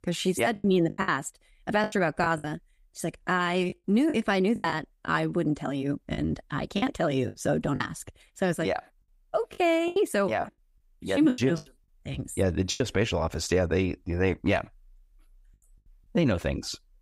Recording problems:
choppy; very; 8% of the speech affected

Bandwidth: 15.5 kHz